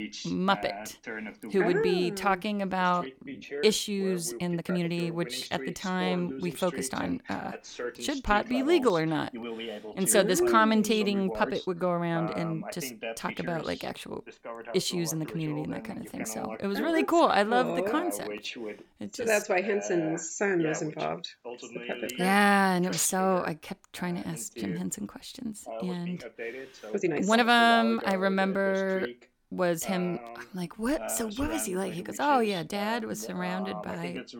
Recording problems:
voice in the background; noticeable; throughout; 10 dB below the speech
uneven, jittery; strongly; from 3 to 31 s

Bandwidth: 18.5 kHz